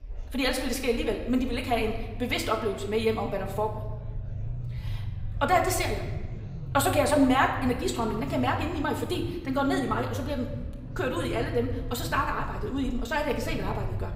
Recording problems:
wrong speed, natural pitch; too fast; 1.6 times normal speed
room echo; slight; dies away in 0.9 s
off-mic speech; somewhat distant
murmuring crowd; faint; throughout; 30 dB below the speech
low rumble; faint; throughout; 25 dB below the speech

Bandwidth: 15.5 kHz